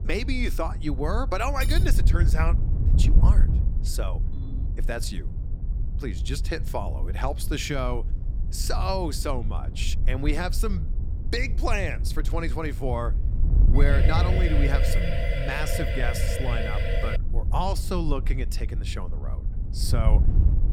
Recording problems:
wind noise on the microphone; occasional gusts; 10 dB below the speech
clattering dishes; noticeable; at 1.5 s; peak 7 dB below the speech
phone ringing; faint; at 4.5 s; peak 15 dB below the speech
siren; noticeable; from 14 to 17 s; peak 1 dB below the speech

